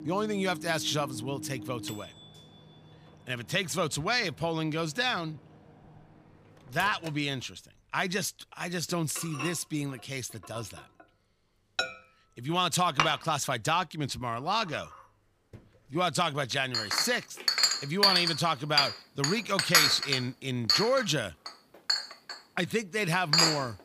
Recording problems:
household noises; very loud; throughout; 2 dB above the speech

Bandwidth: 15 kHz